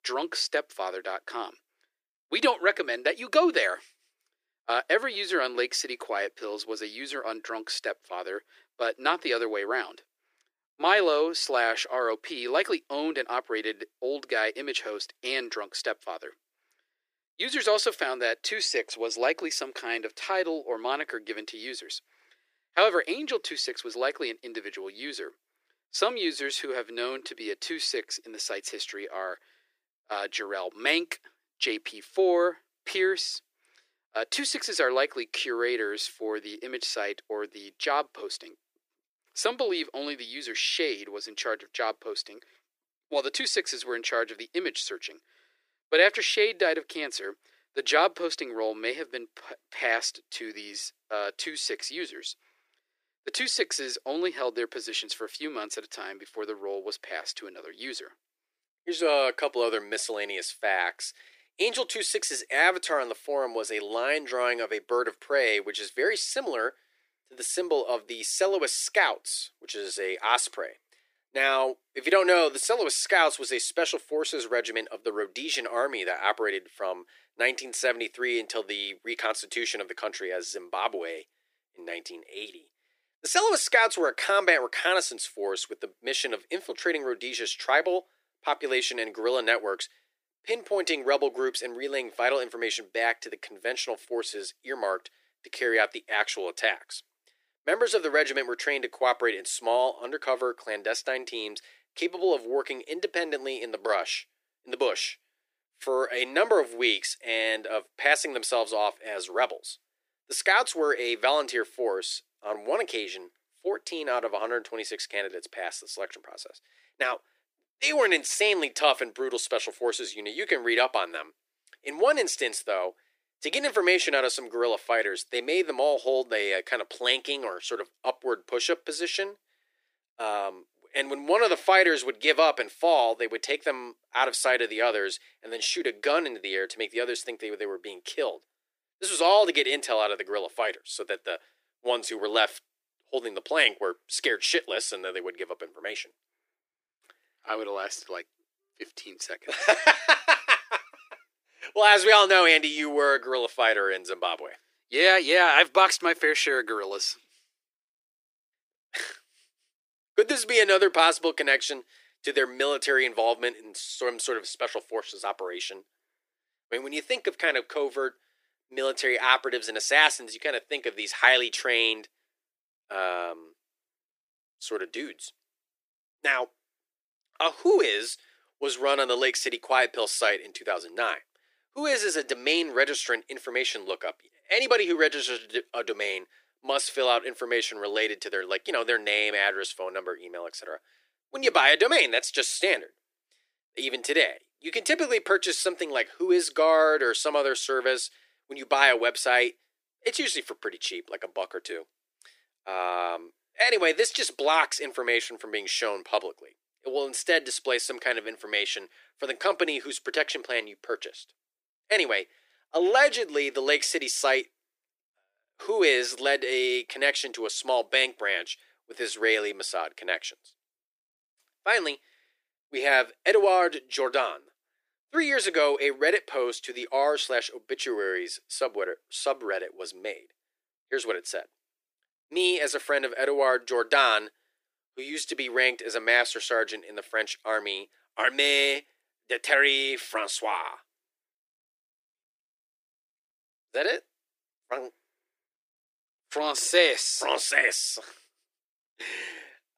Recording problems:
thin; very; fading below 350 Hz

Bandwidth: 15 kHz